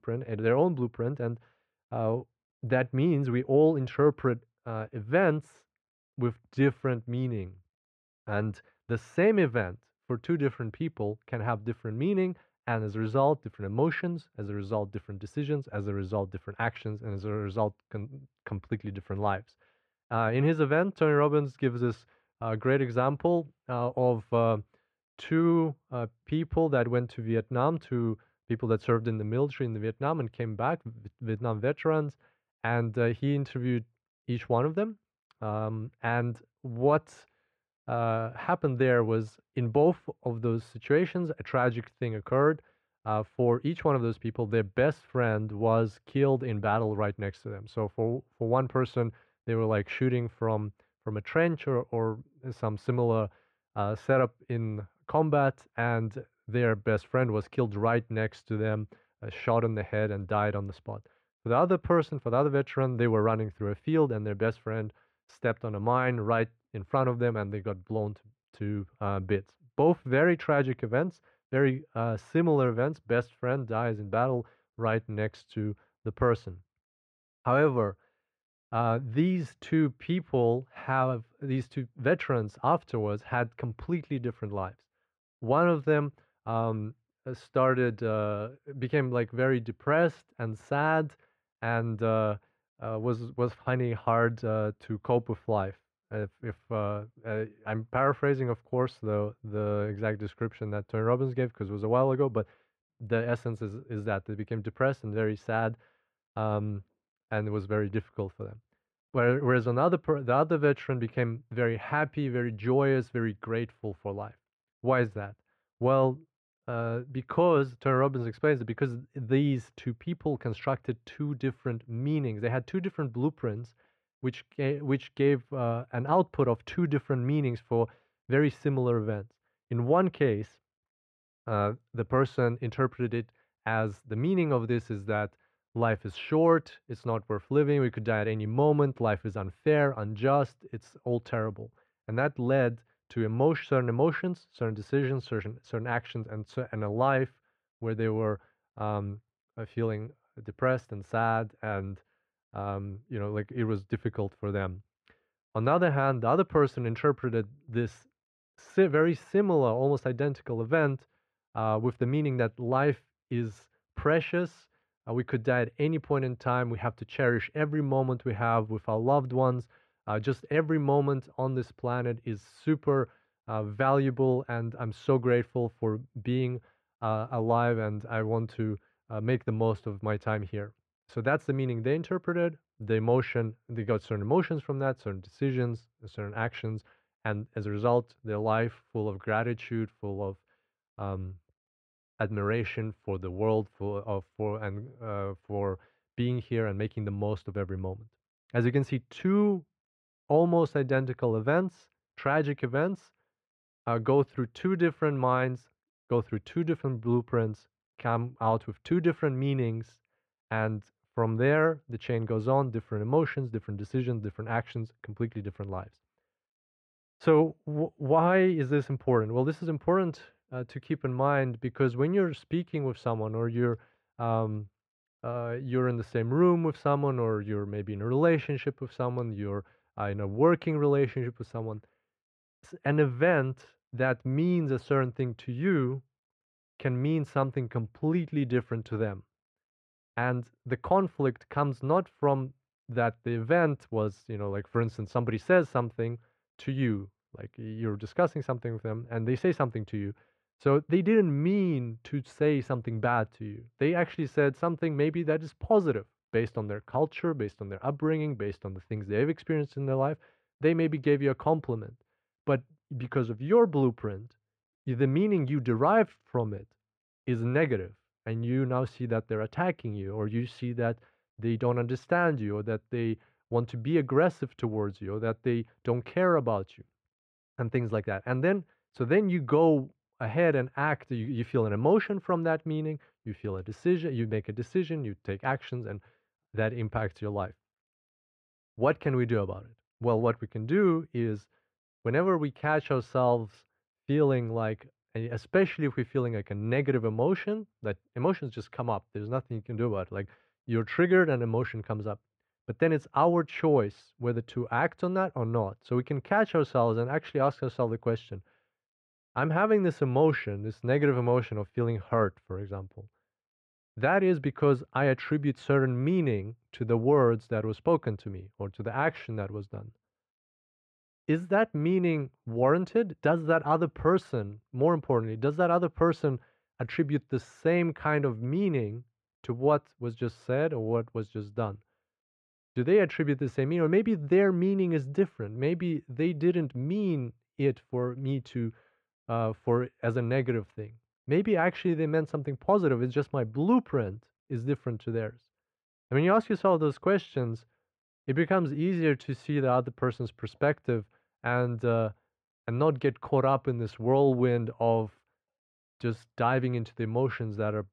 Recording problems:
muffled; very; fading above 1.5 kHz

